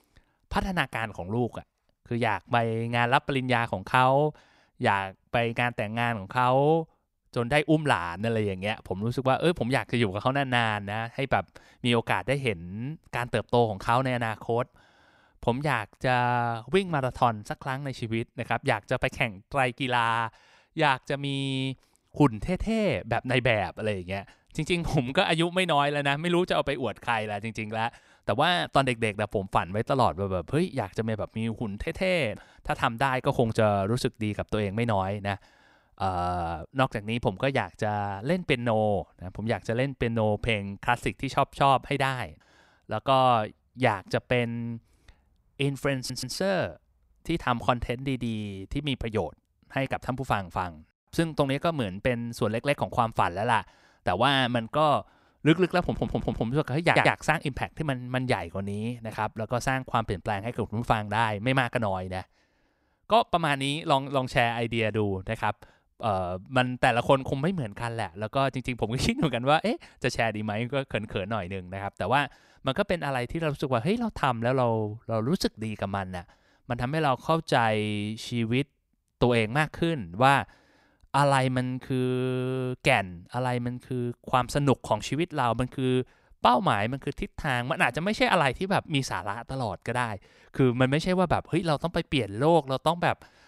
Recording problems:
audio stuttering; at 46 s, at 56 s and at 57 s

